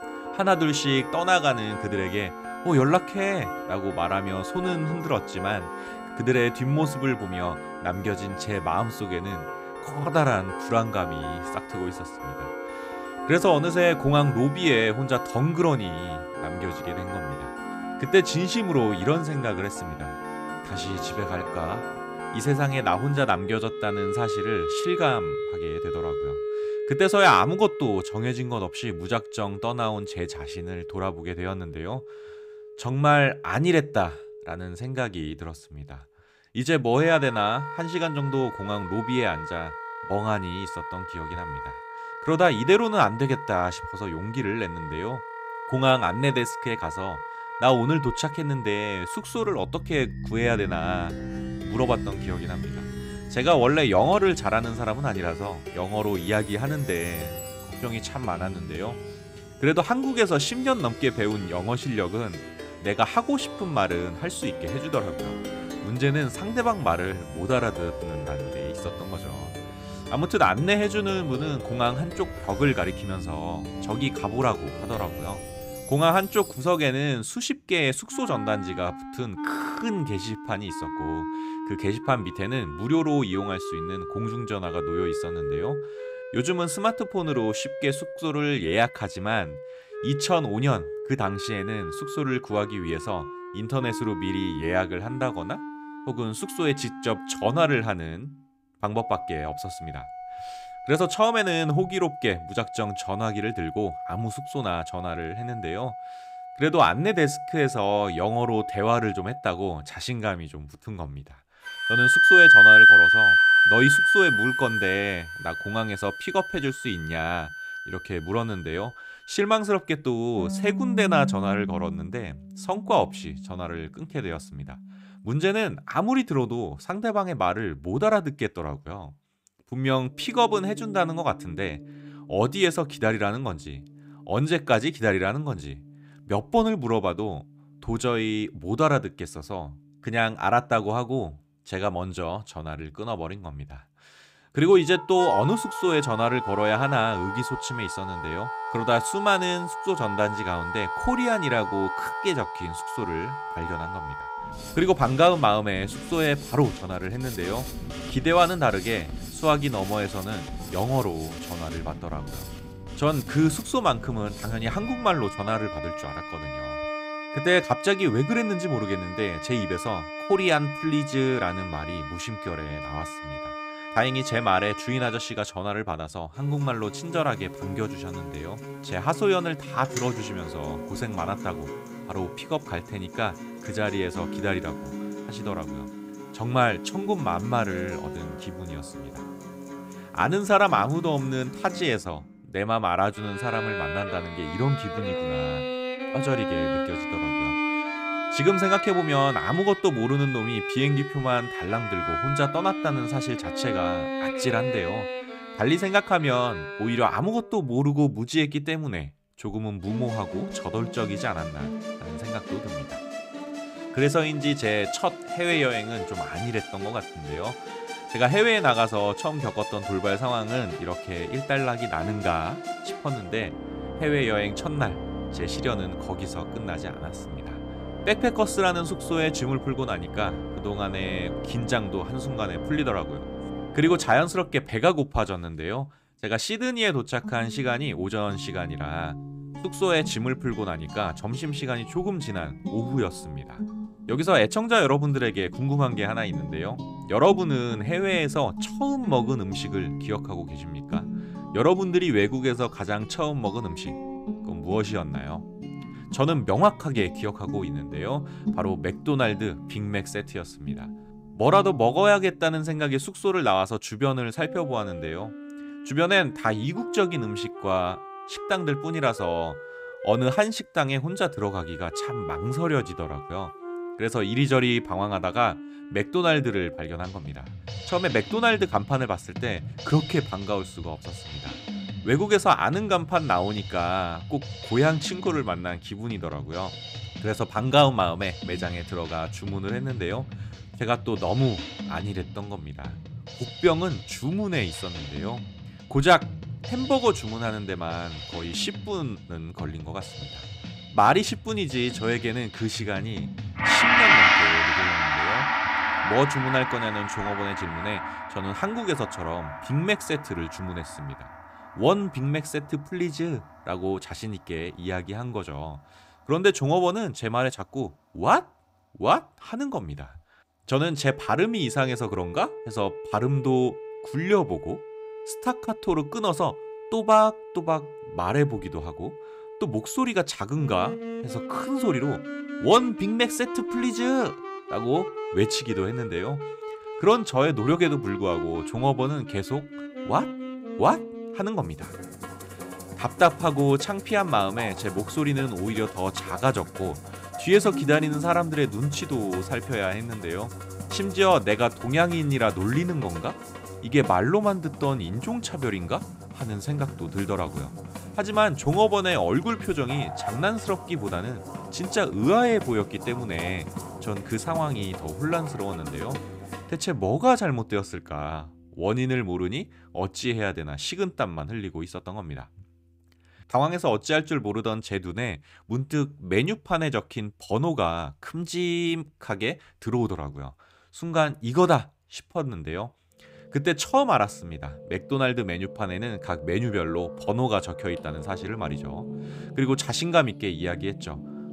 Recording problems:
background music; loud; throughout; 4 dB below the speech

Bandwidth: 15.5 kHz